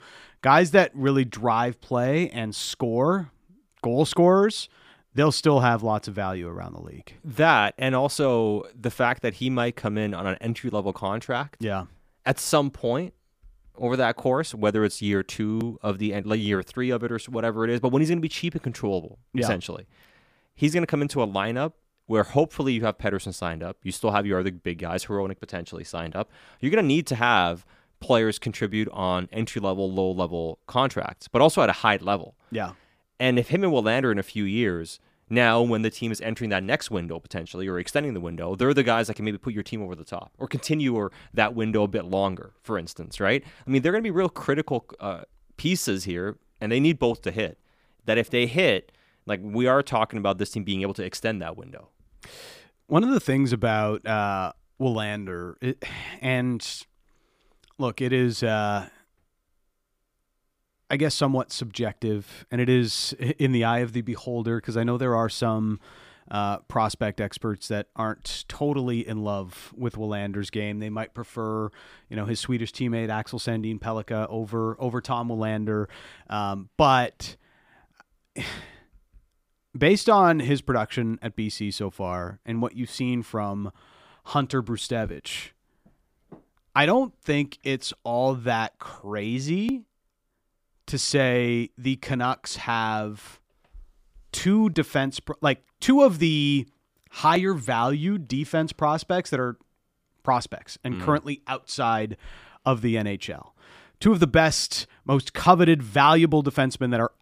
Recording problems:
none

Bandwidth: 15 kHz